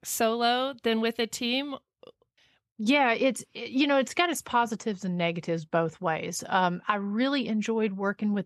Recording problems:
none

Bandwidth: 13.5 kHz